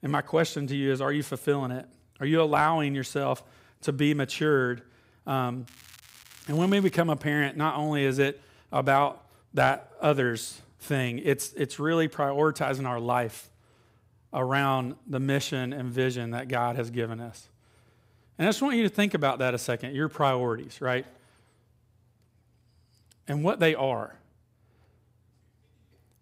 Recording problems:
crackling; faint; from 5.5 to 7 s; 25 dB below the speech

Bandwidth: 15.5 kHz